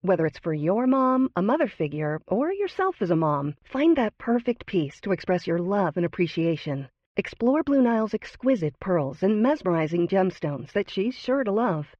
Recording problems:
muffled; very; fading above 2.5 kHz

